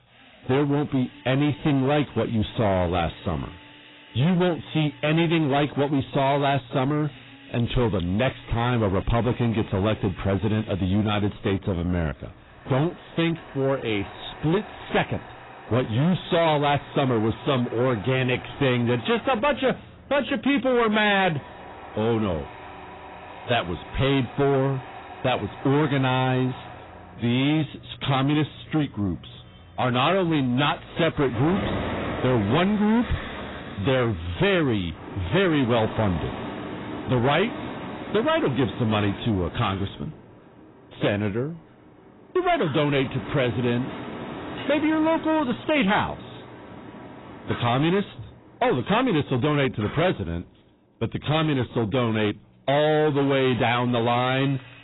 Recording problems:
distortion; heavy; 7 dB below the speech
garbled, watery; badly; nothing above 4 kHz
machinery noise; noticeable; throughout; 15 dB below the speech

